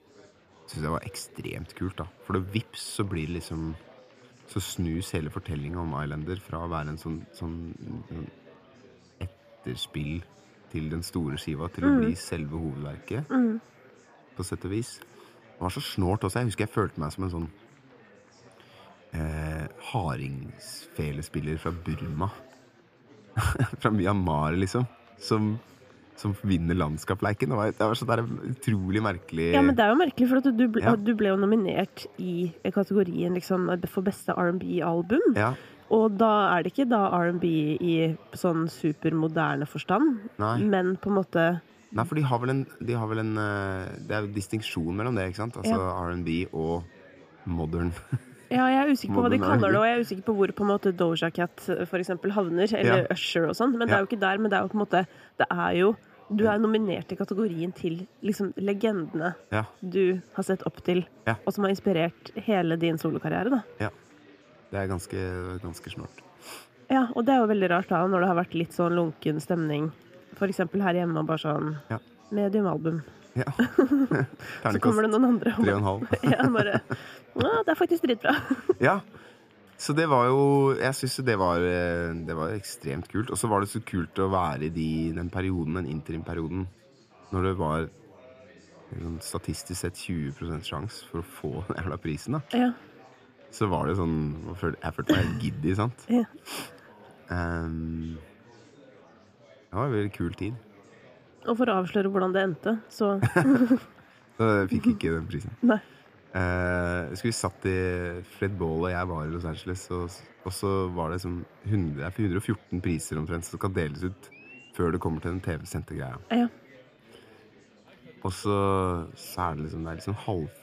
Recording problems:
chatter from many people; faint; throughout; 25 dB below the speech

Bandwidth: 15 kHz